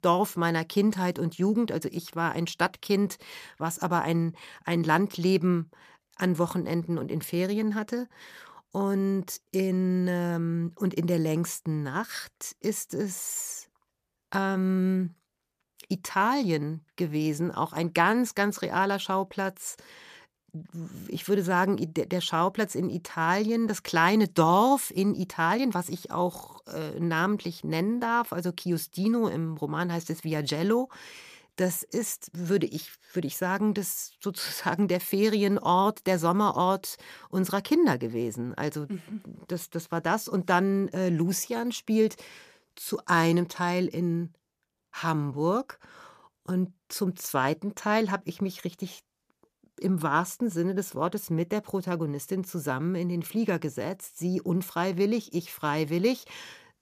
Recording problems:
none

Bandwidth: 14.5 kHz